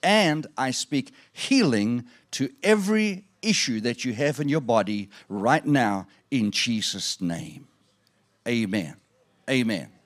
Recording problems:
none

